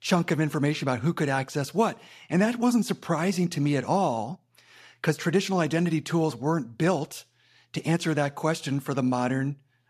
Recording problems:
none

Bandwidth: 14.5 kHz